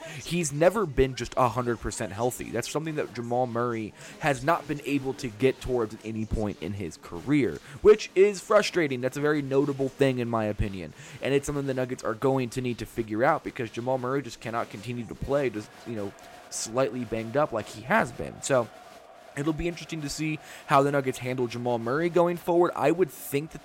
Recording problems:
crowd noise; faint; throughout; 25 dB below the speech

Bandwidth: 16 kHz